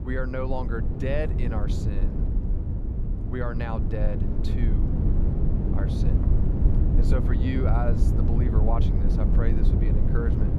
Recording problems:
low rumble; loud; throughout; 3 dB below the speech

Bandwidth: 15.5 kHz